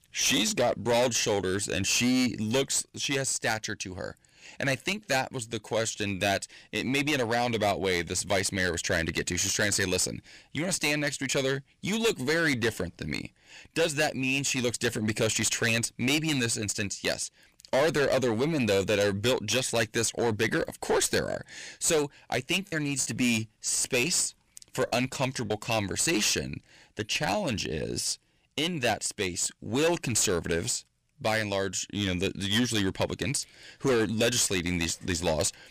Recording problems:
distortion; heavy; 9% of the sound clipped
choppy; occasionally; from 23 to 26 s; 3% of the speech affected

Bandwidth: 15 kHz